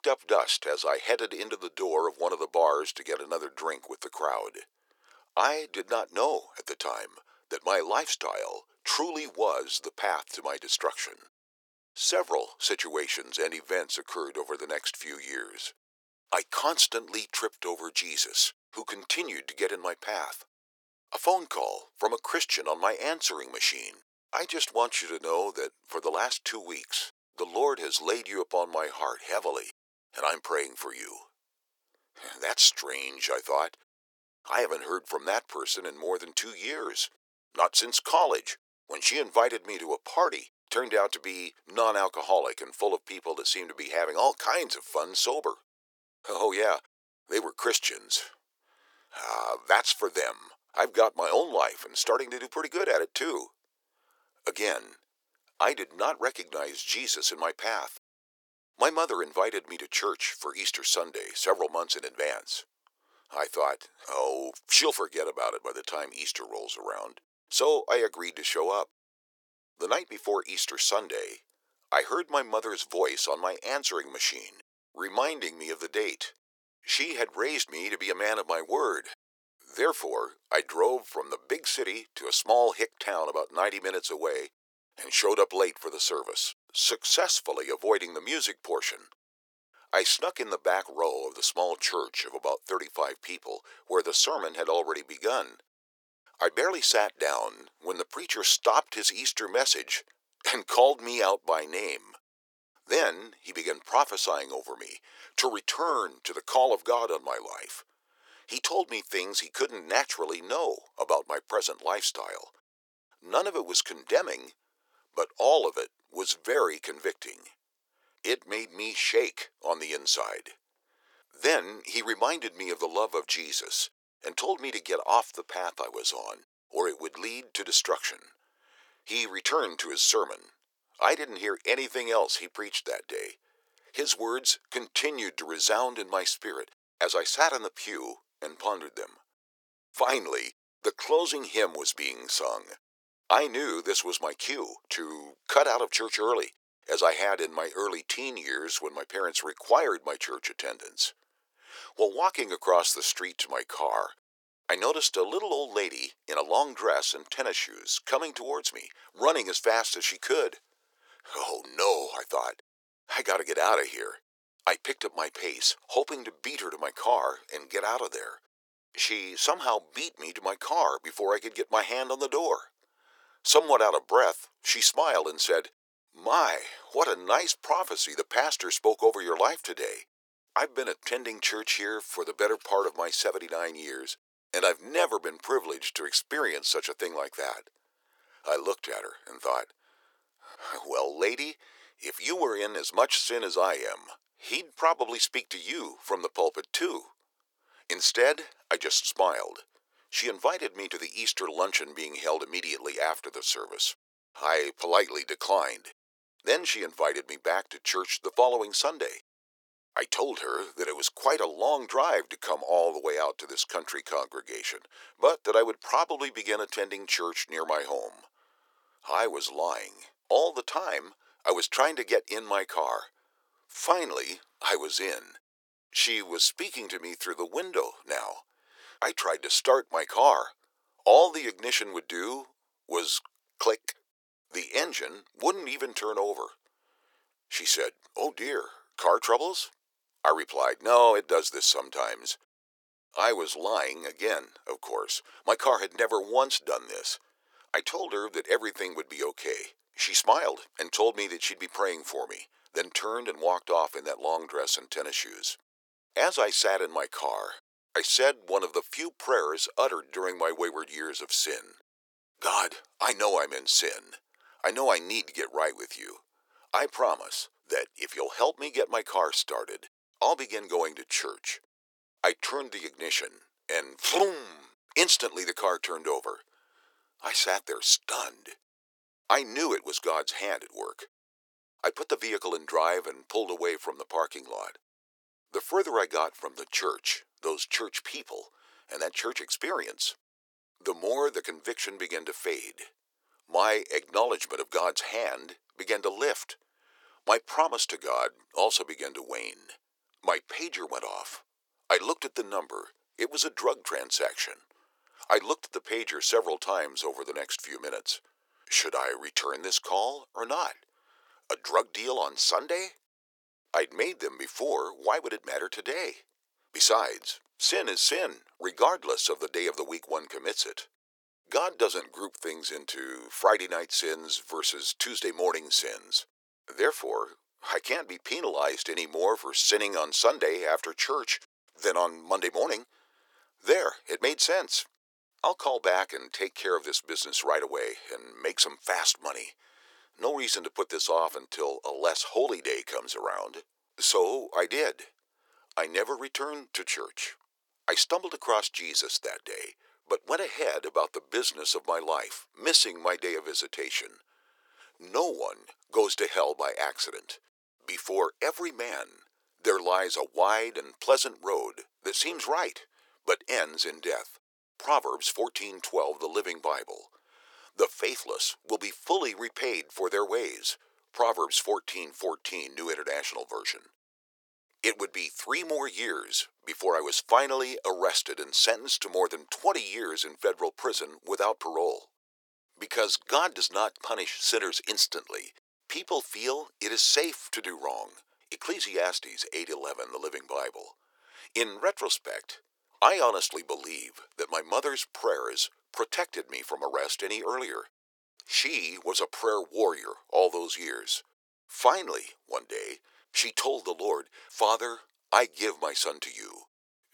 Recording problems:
thin; very; fading below 400 Hz

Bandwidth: 18.5 kHz